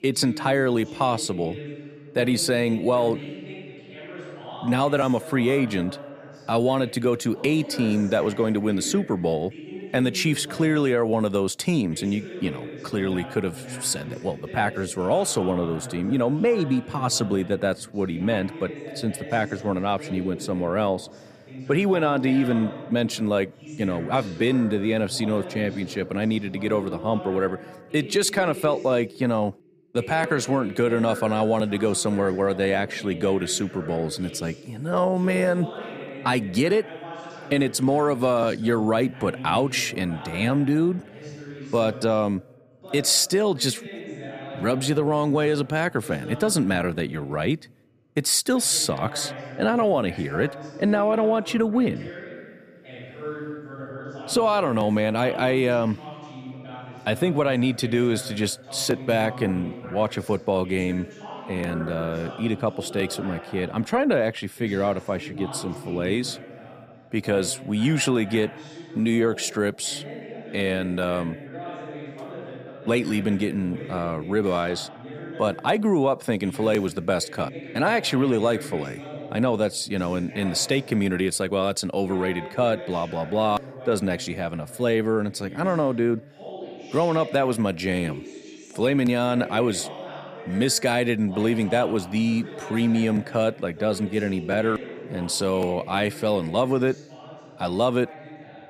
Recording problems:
voice in the background; noticeable; throughout; 15 dB below the speech

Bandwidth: 14.5 kHz